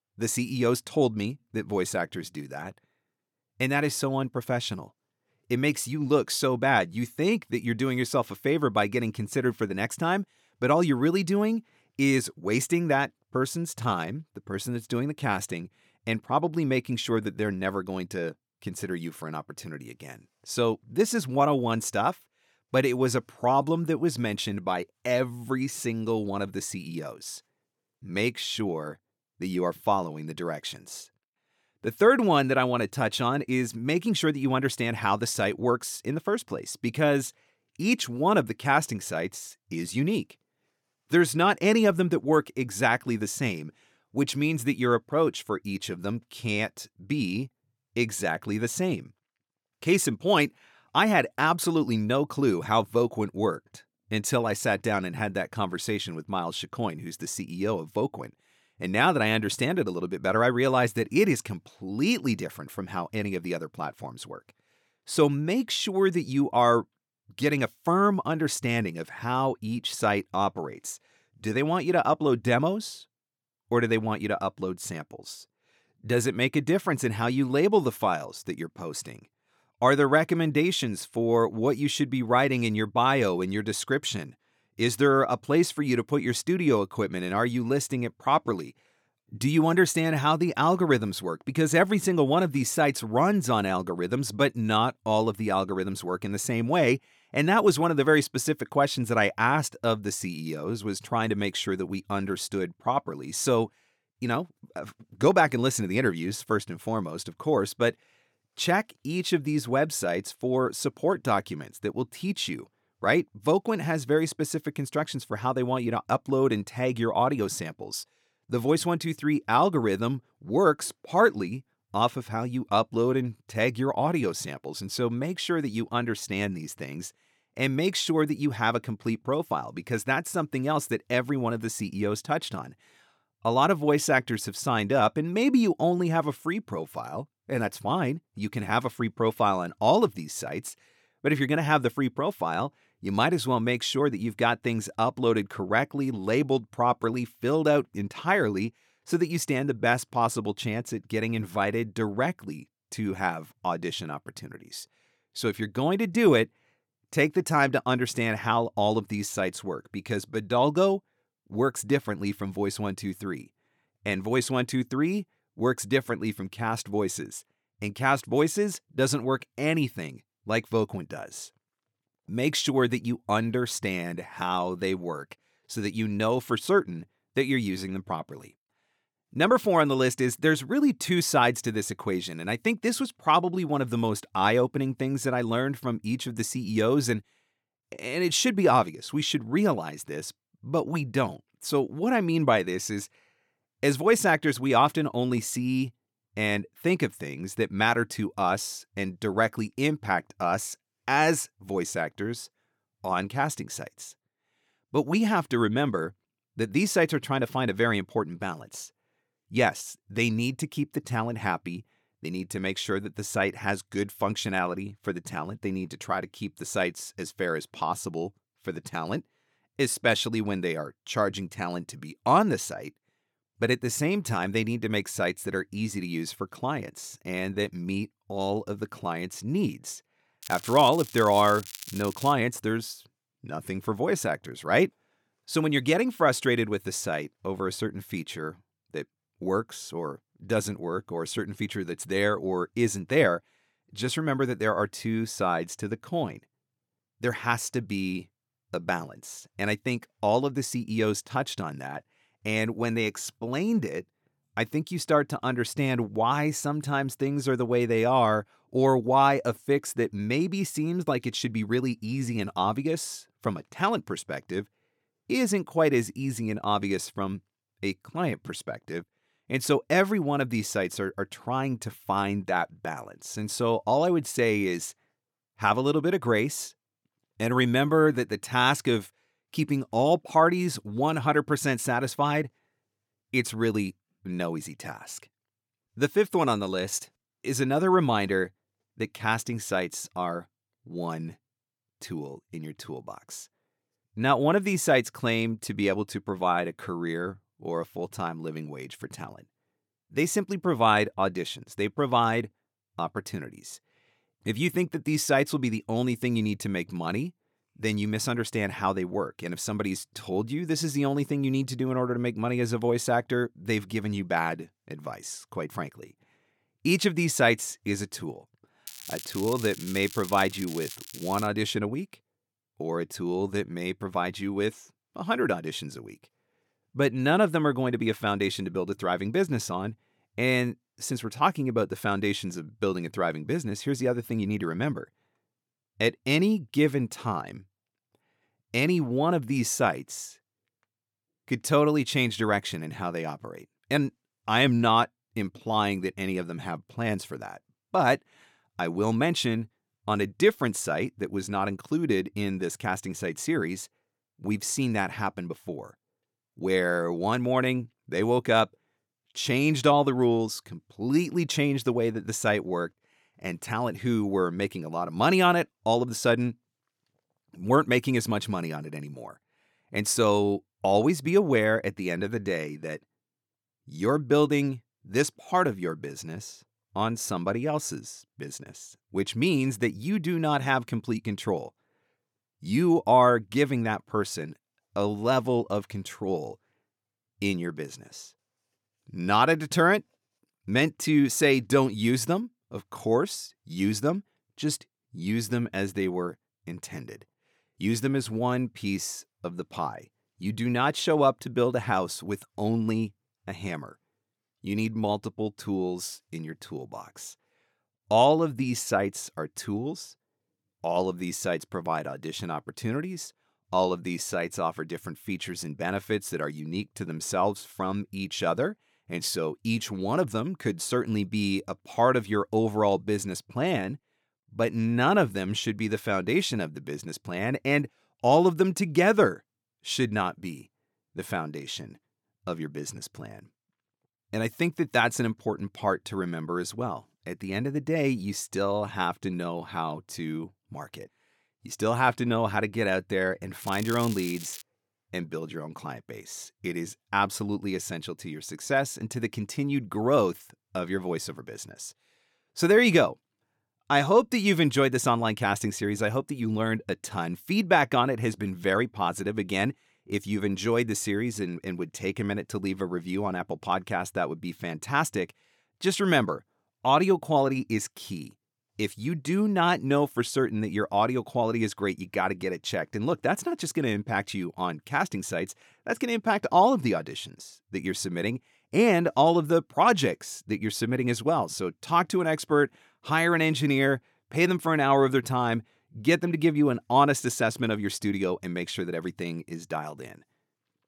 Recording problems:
crackling; noticeable; from 3:50 to 3:52, from 5:19 to 5:21 and at 7:24; 15 dB below the speech

